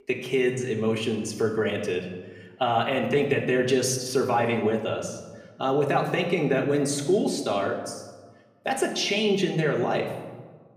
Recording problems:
room echo; slight; dies away in 1 s
off-mic speech; somewhat distant

